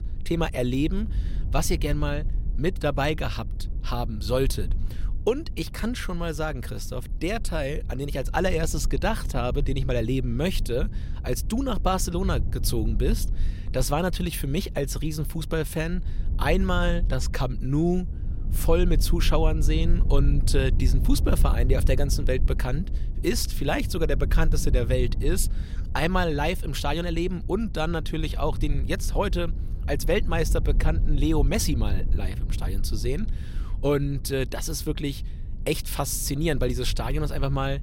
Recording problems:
low rumble; noticeable; throughout; 20 dB below the speech

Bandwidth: 16 kHz